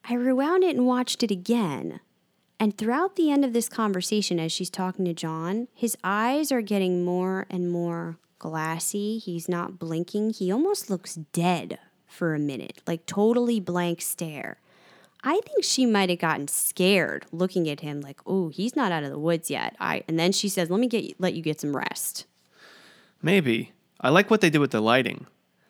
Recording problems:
none

